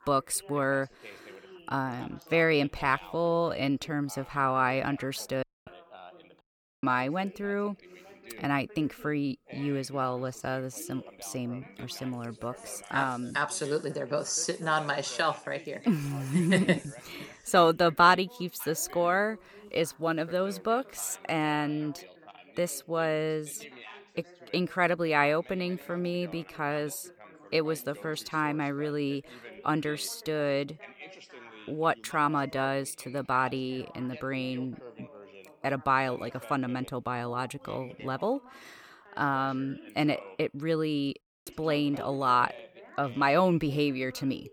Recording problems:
background chatter; noticeable; throughout; 2 voices, 20 dB below the speech
audio cutting out; at 5.5 s, at 6.5 s and at 41 s

